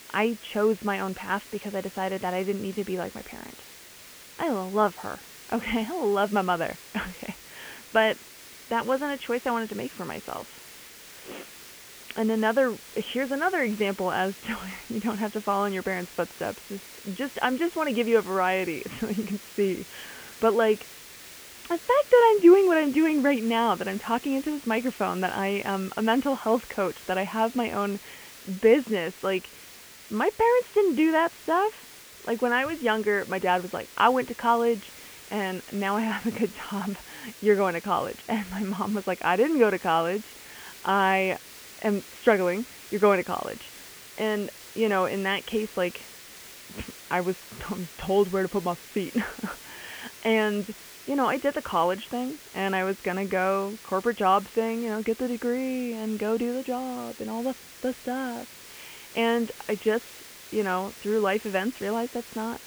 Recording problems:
high frequencies cut off; severe; nothing above 3.5 kHz
hiss; noticeable; throughout; 15 dB below the speech

